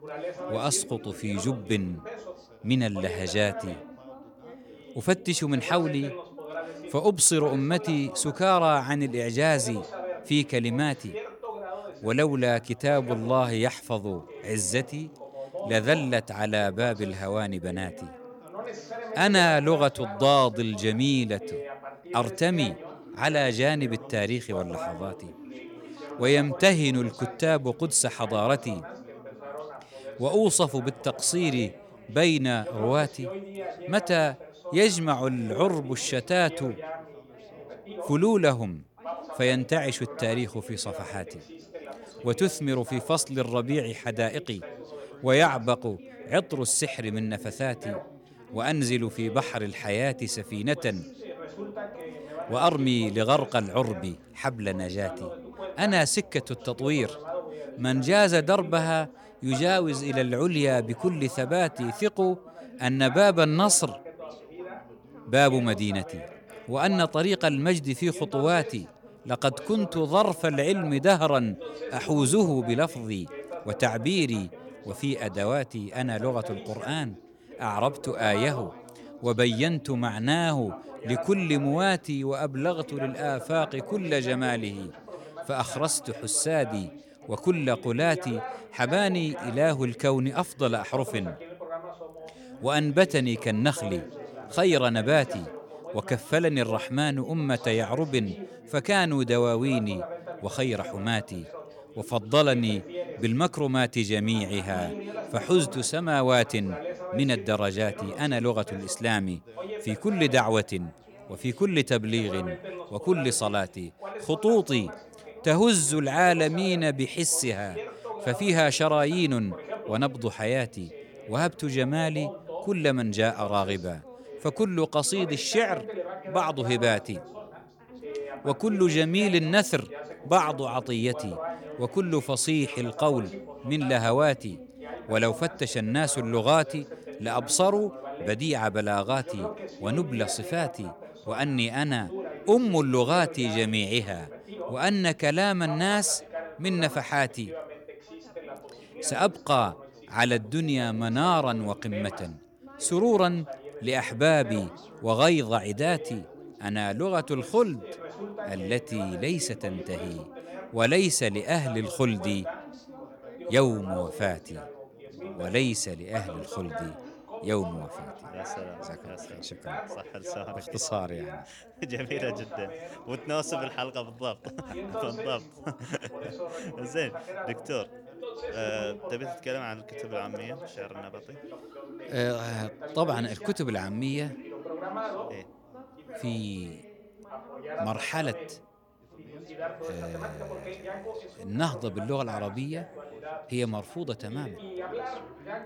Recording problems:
background chatter; noticeable; throughout; 3 voices, 15 dB below the speech

